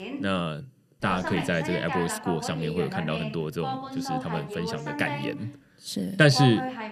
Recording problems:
voice in the background; loud; throughout; 6 dB below the speech

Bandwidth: 13.5 kHz